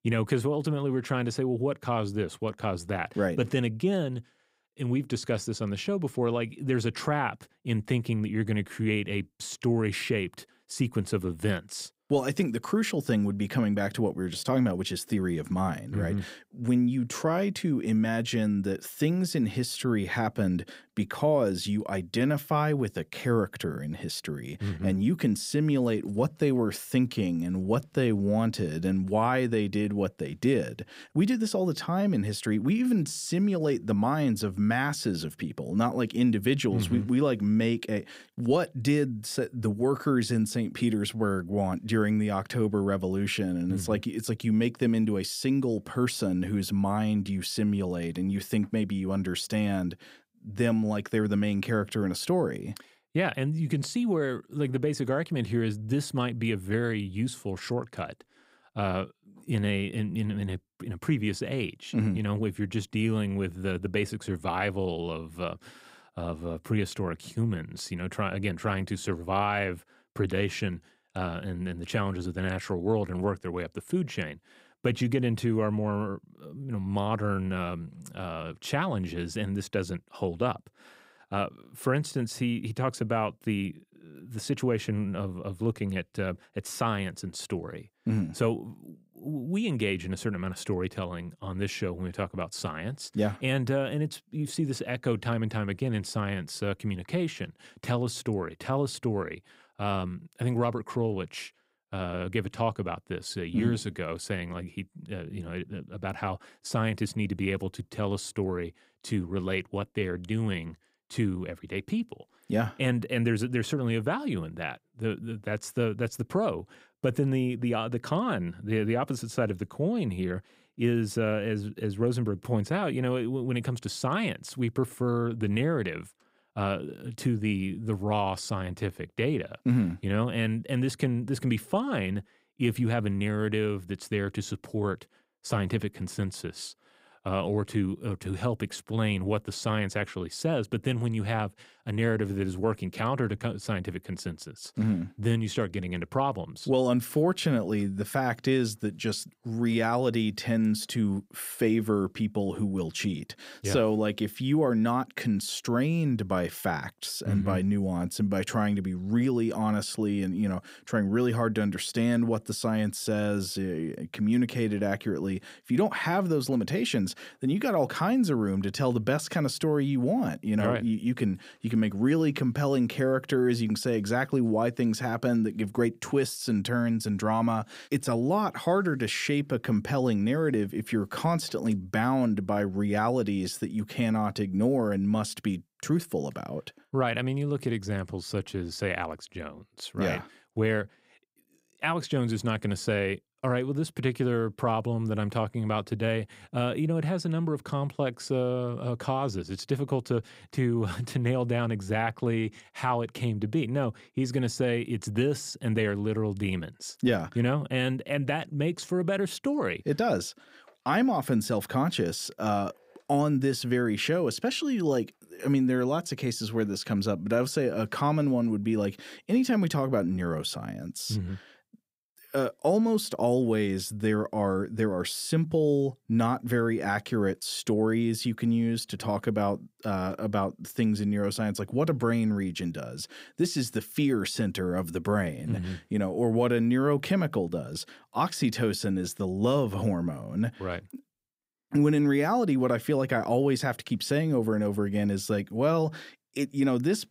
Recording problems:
none

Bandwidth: 15.5 kHz